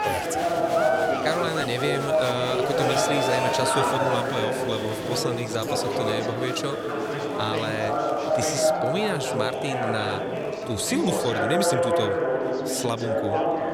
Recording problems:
chatter from many people; very loud; throughout; 3 dB above the speech

